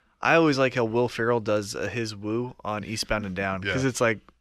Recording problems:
none

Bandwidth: 14.5 kHz